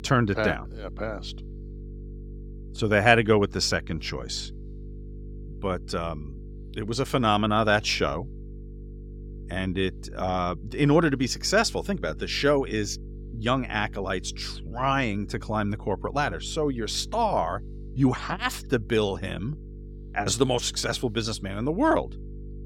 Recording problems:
electrical hum; faint; throughout; 50 Hz, 25 dB below the speech

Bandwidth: 16.5 kHz